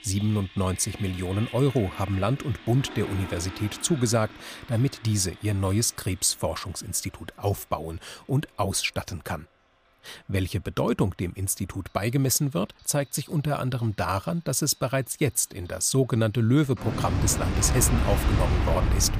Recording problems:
household noises; loud; throughout; 5 dB below the speech

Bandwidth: 15 kHz